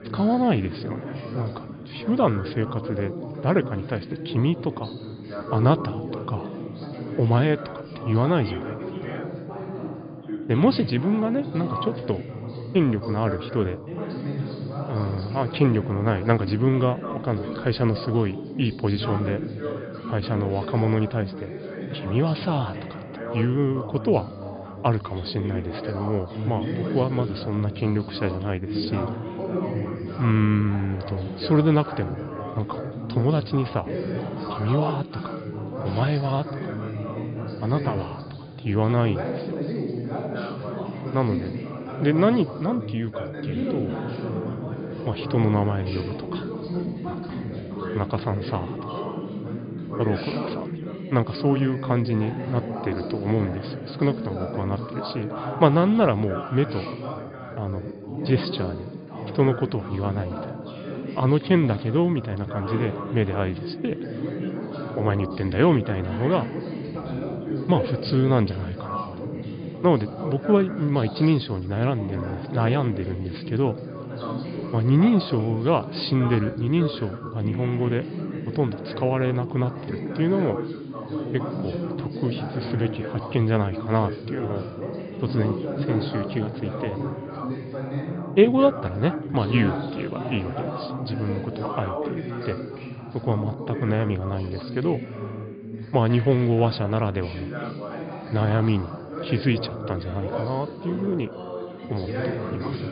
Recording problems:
high frequencies cut off; severe; nothing above 5 kHz
background chatter; loud; throughout; 3 voices, 7 dB below the speech

